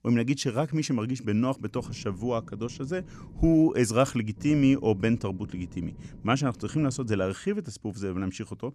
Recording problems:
low rumble; faint; from 1.5 to 3.5 s and from 4.5 to 7.5 s; 25 dB below the speech

